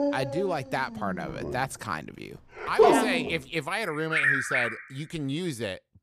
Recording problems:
animal sounds; very loud; throughout; 5 dB above the speech

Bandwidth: 15 kHz